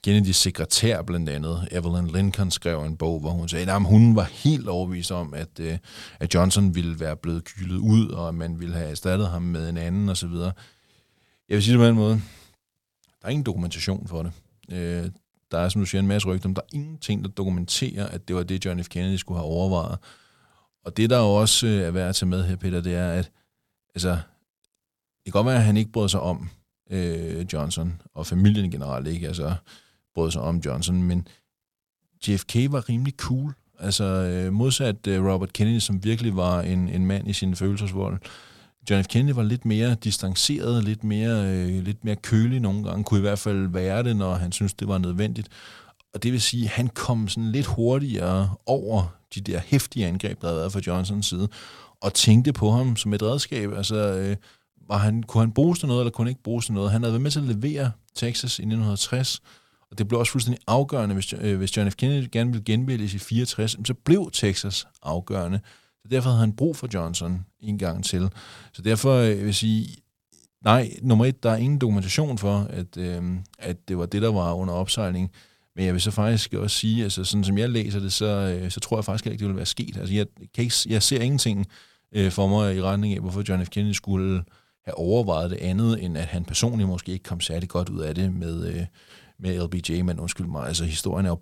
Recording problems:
none

